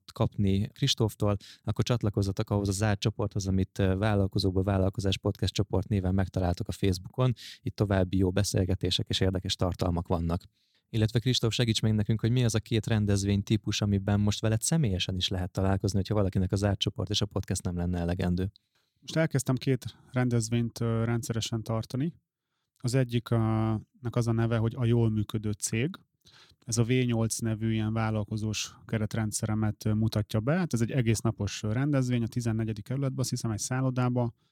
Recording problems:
none

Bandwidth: 17.5 kHz